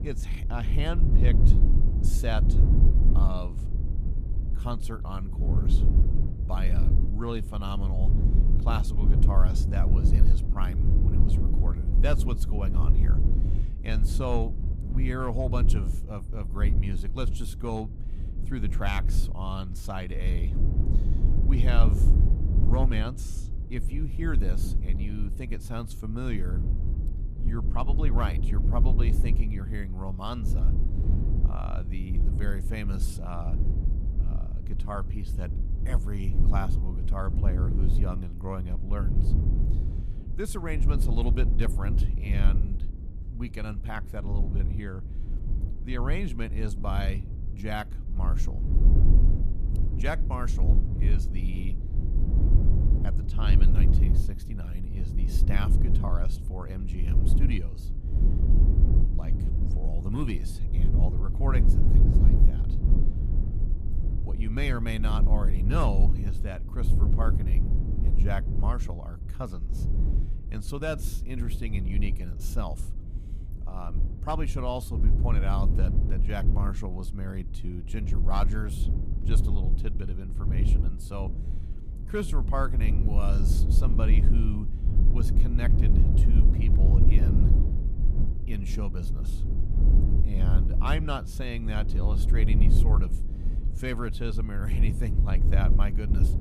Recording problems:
low rumble; loud; throughout; 5 dB below the speech

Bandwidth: 14.5 kHz